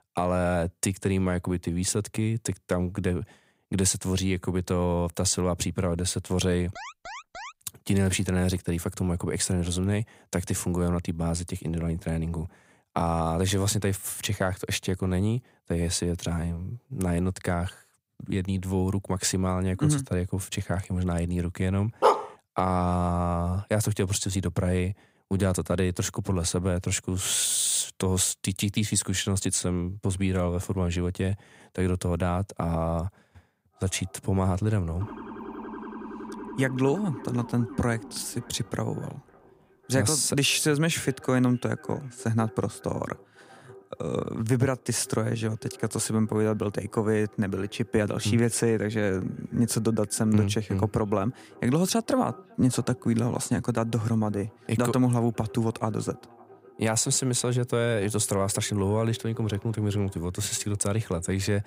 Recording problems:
echo of what is said; faint; from 34 s on; 550 ms later, 25 dB below the speech
alarm; faint; at 7 s; peak 10 dB below the speech
dog barking; loud; at 22 s; peak 4 dB above the speech
siren; faint; from 35 to 39 s; peak 10 dB below the speech

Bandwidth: 15.5 kHz